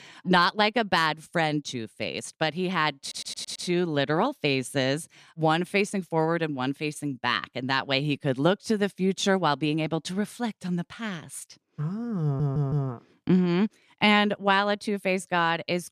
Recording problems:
audio stuttering; at 3 s and at 12 s

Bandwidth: 14.5 kHz